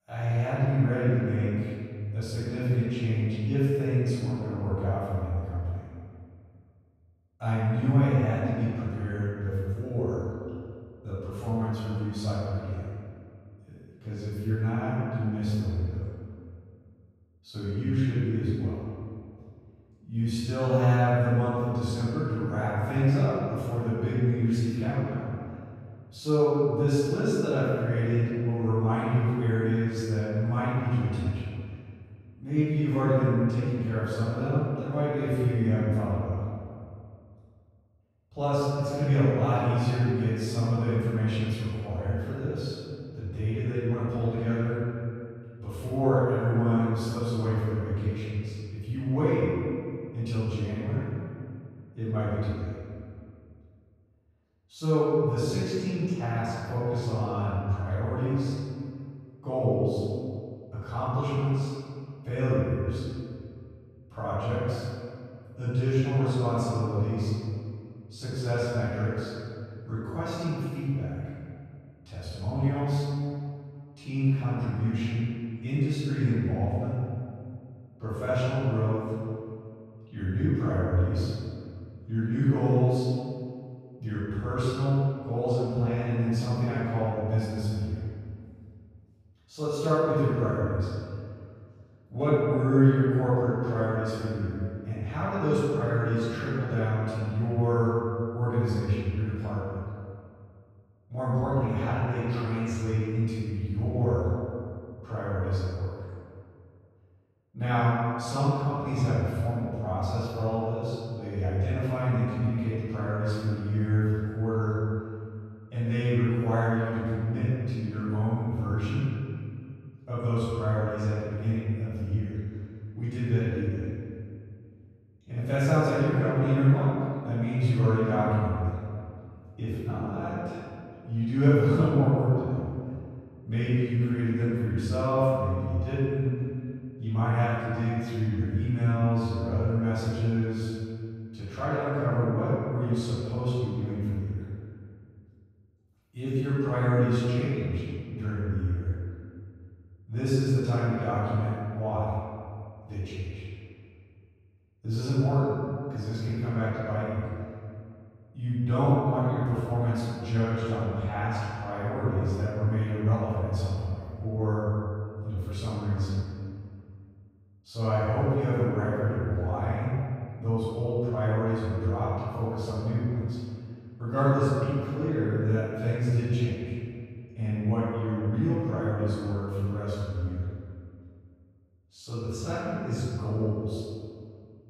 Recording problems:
room echo; strong; dies away in 2.1 s
off-mic speech; far

